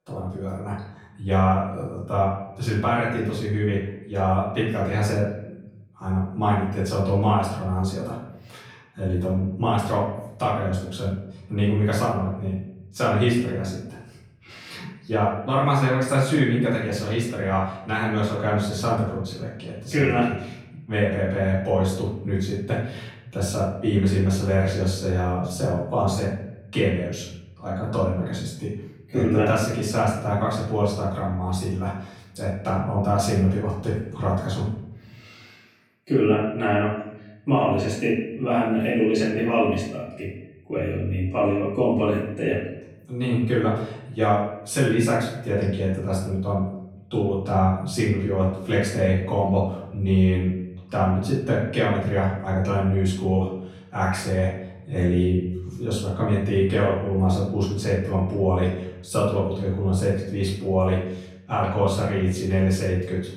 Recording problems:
off-mic speech; far
room echo; noticeable; dies away in 0.8 s

